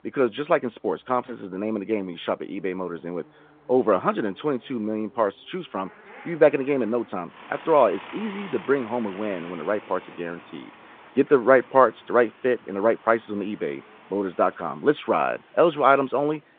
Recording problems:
phone-call audio
traffic noise; faint; throughout; 20 dB below the speech

